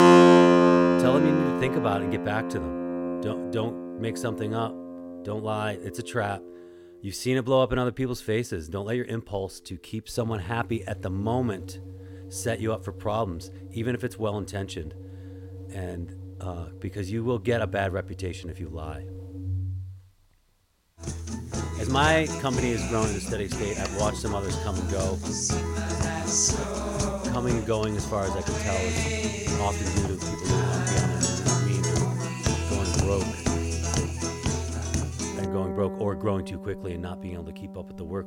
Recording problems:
background music; very loud; throughout; 4 dB above the speech

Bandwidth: 16.5 kHz